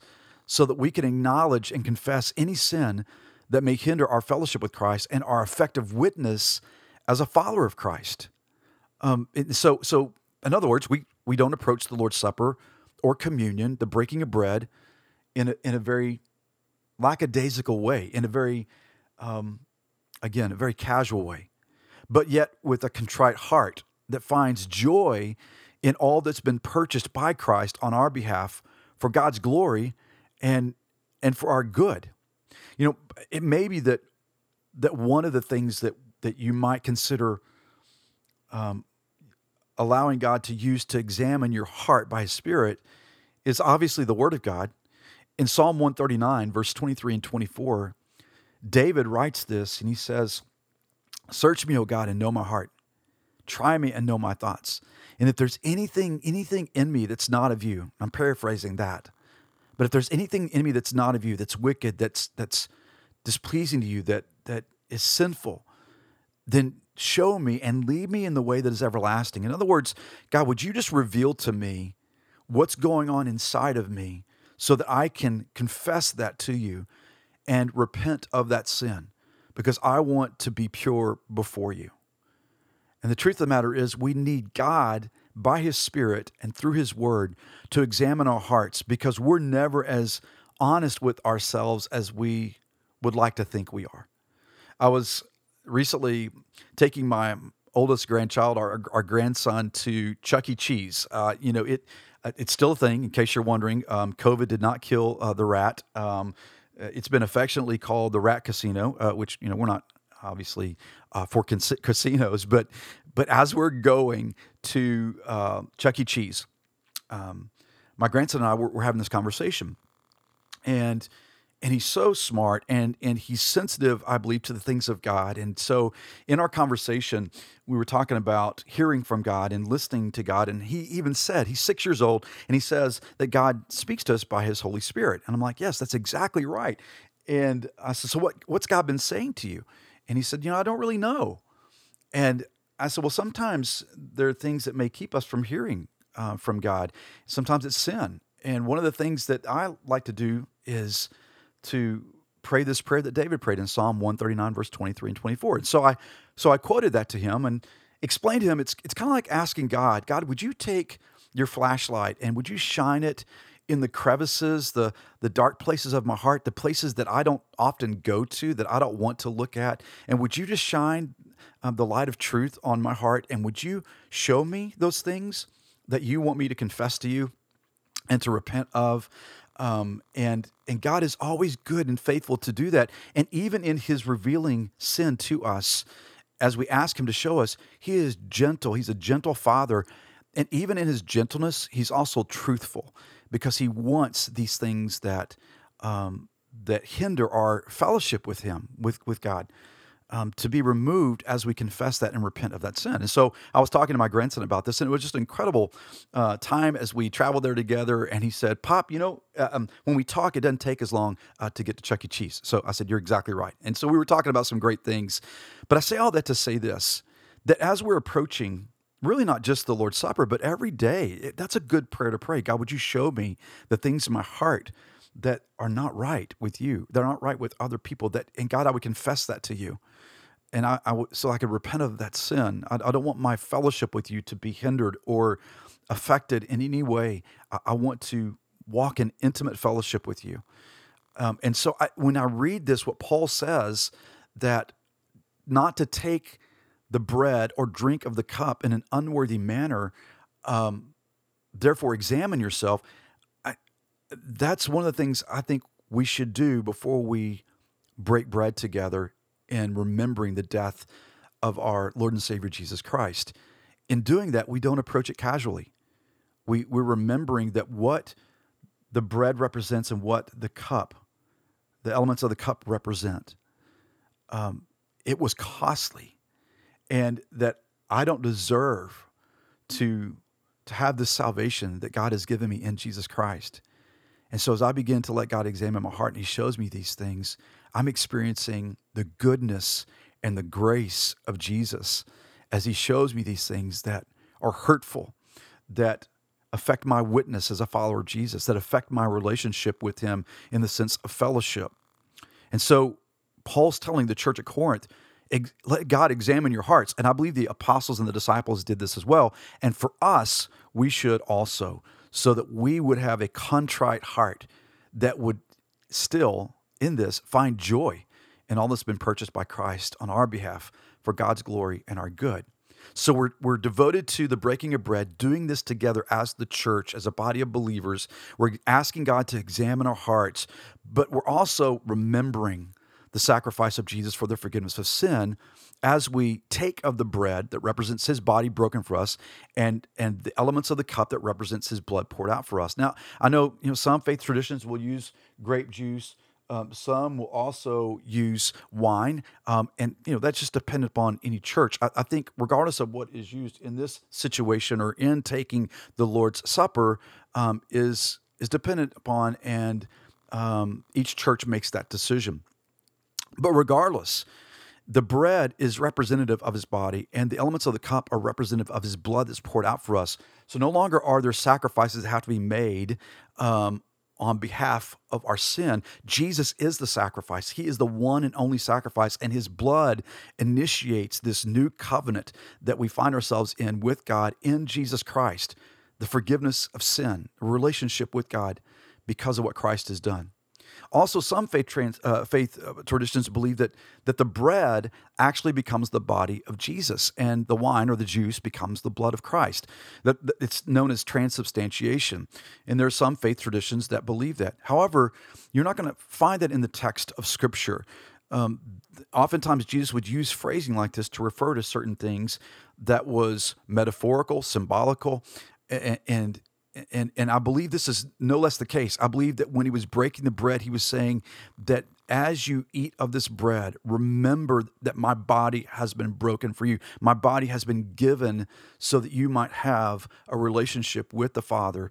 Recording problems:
none

